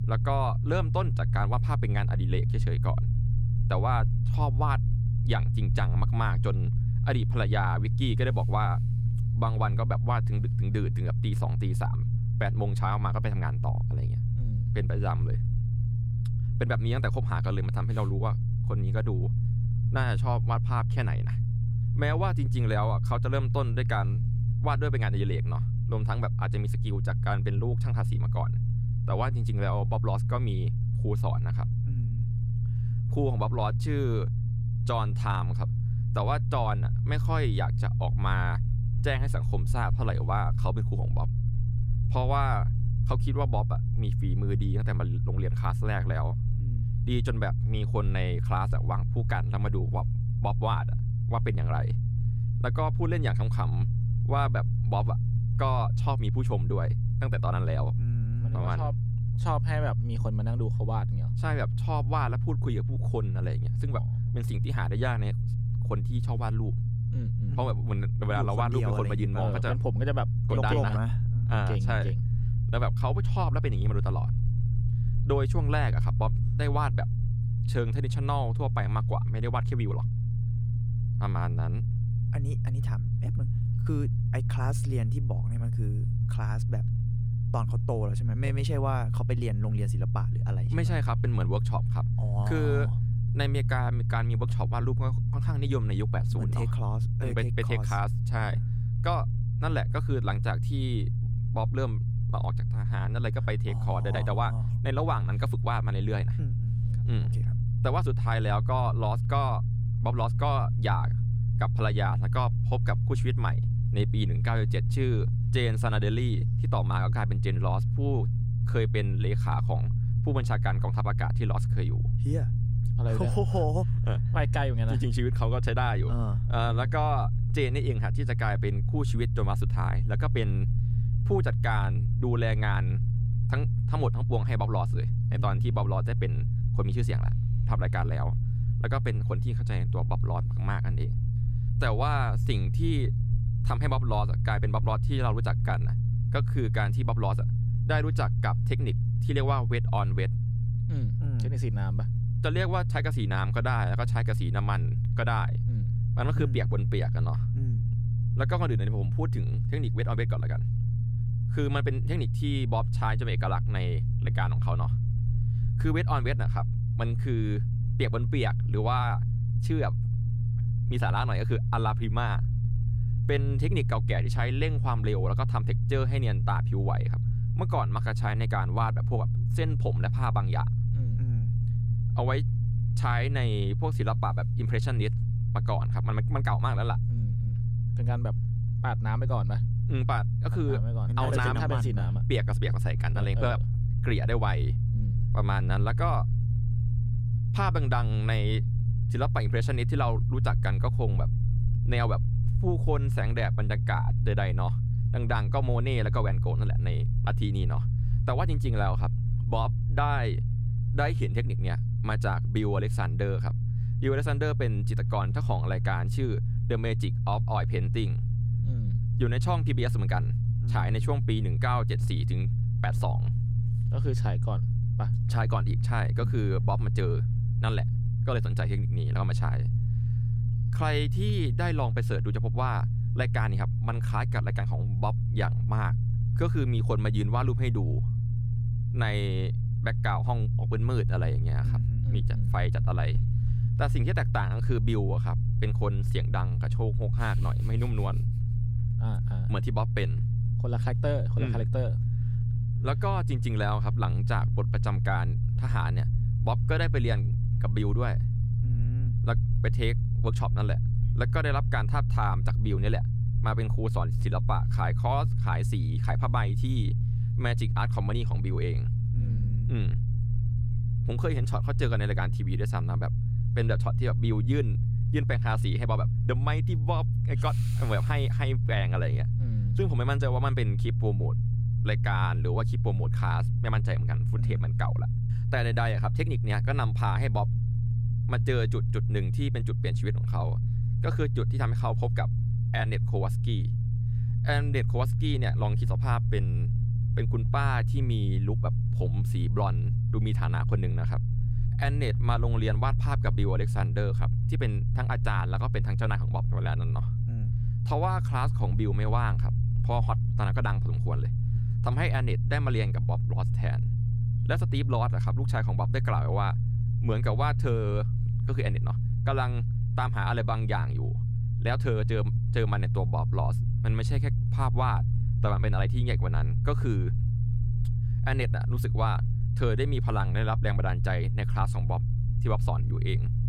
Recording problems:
low rumble; loud; throughout; 7 dB below the speech

